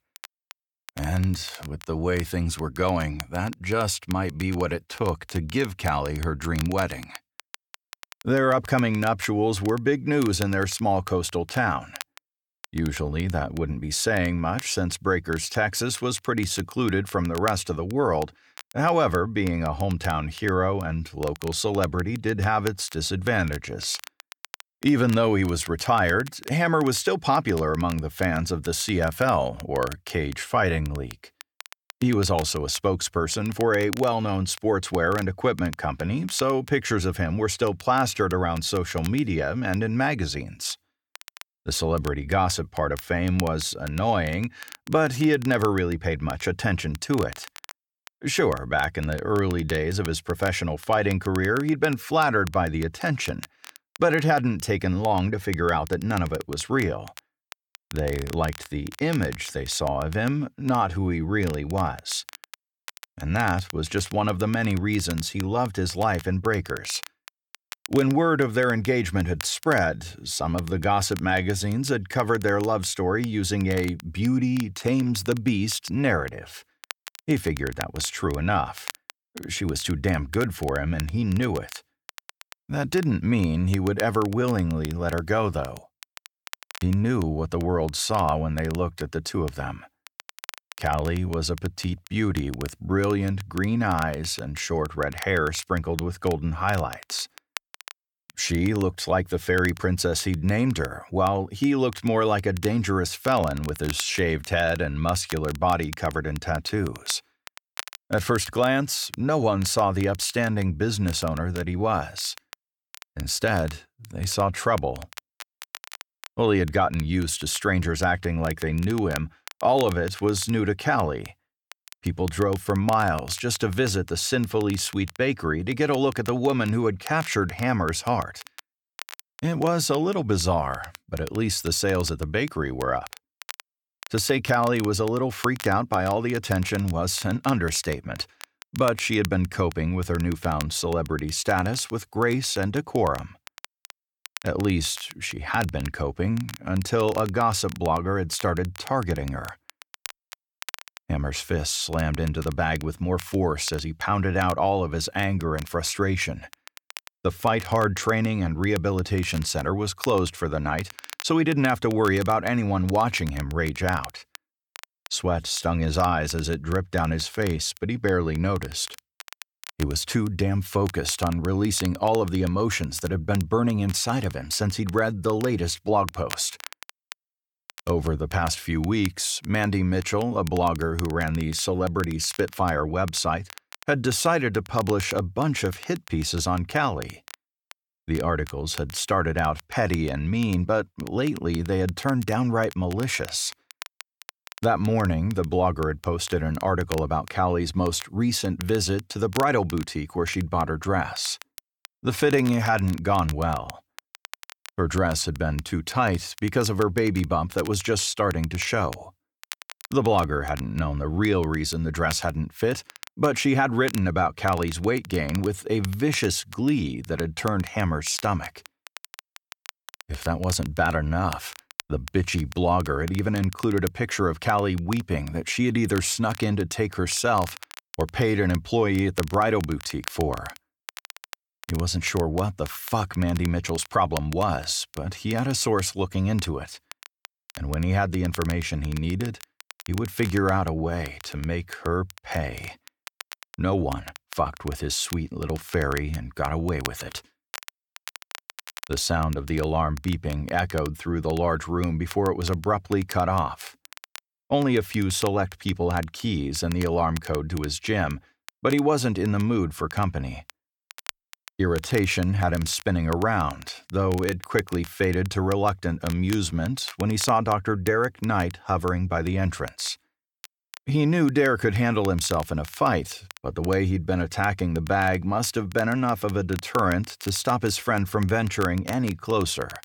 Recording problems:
crackle, like an old record; noticeable; 20 dB below the speech

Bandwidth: 18.5 kHz